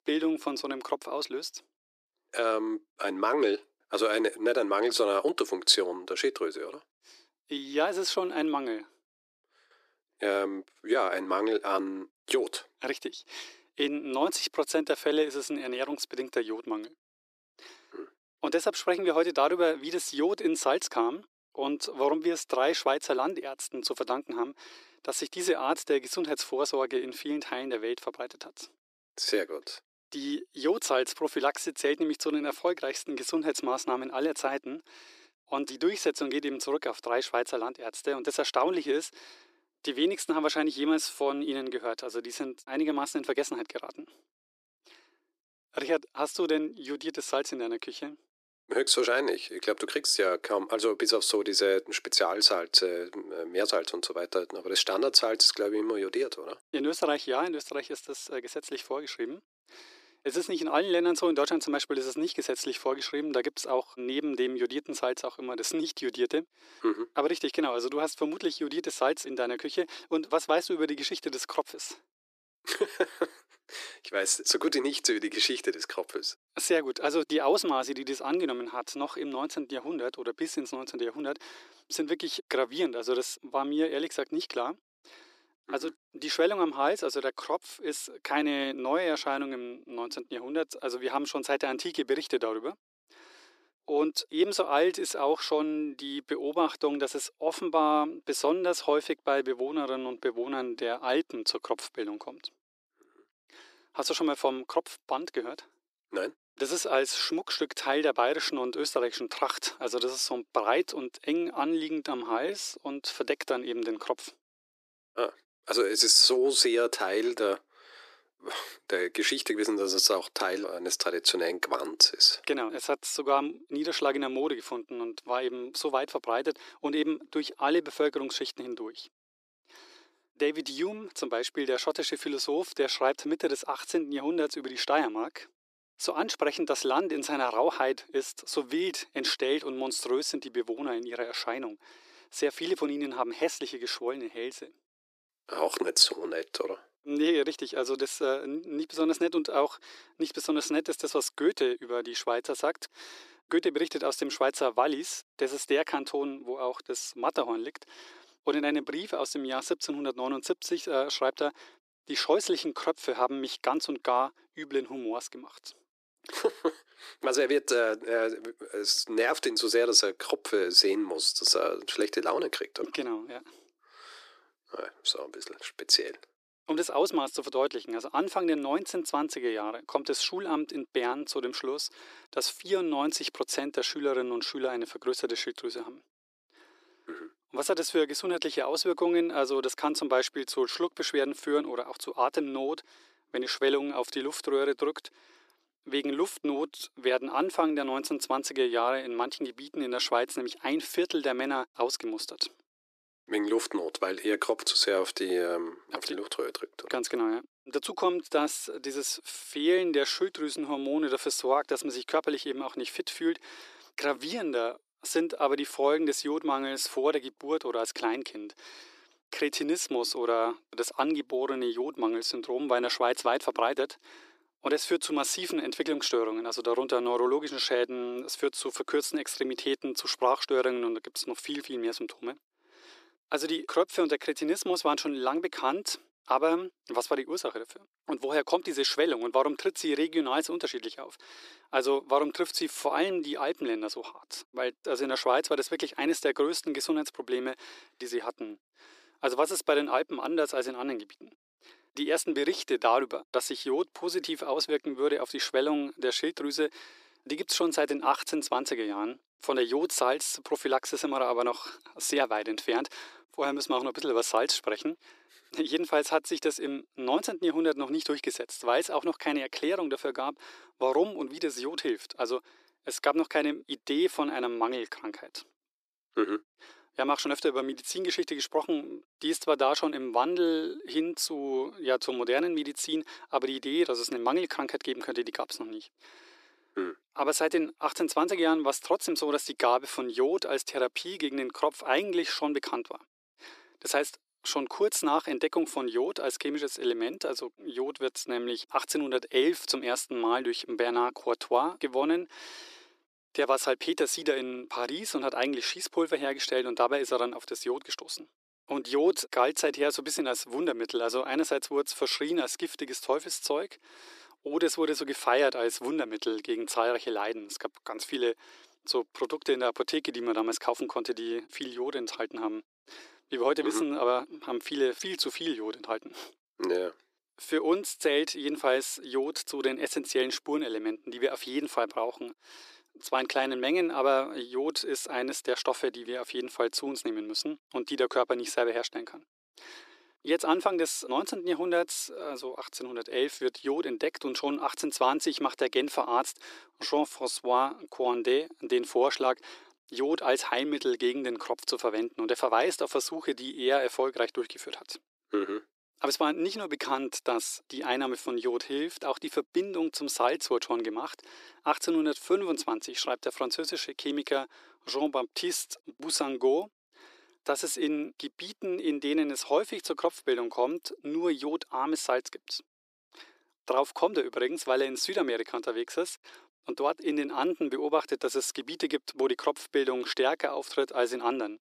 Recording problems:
thin; very; fading below 350 Hz

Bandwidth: 14.5 kHz